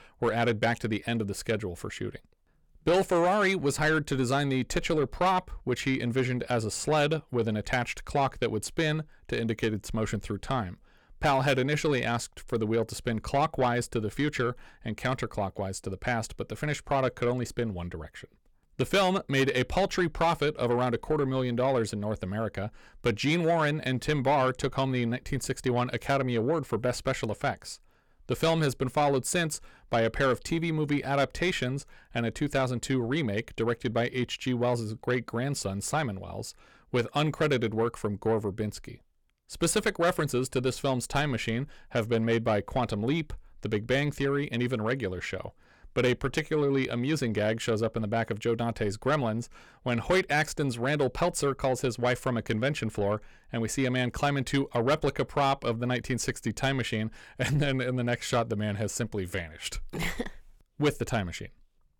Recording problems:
distortion; slight; 10 dB below the speech

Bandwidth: 18 kHz